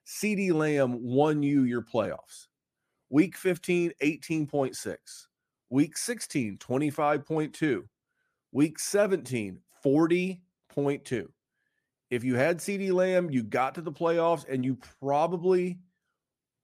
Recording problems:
none

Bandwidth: 14.5 kHz